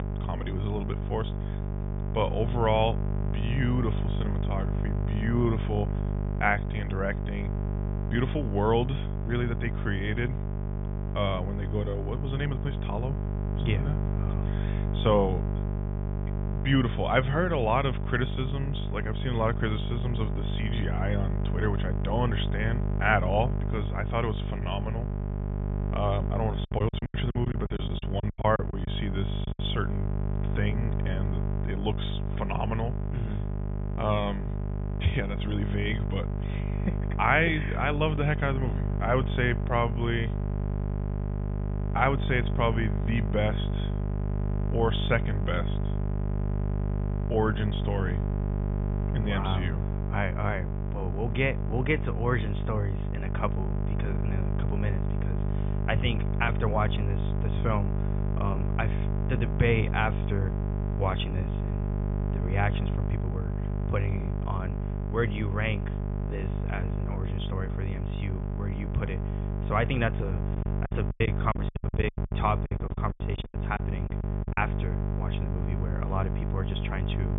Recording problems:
high frequencies cut off; severe; nothing above 3.5 kHz
electrical hum; loud; throughout; 50 Hz, 9 dB below the speech
choppy; very; from 27 to 29 s and from 1:11 to 1:15; 22% of the speech affected

